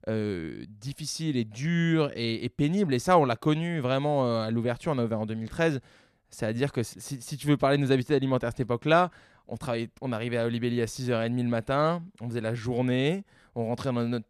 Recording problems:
none

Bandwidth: 14 kHz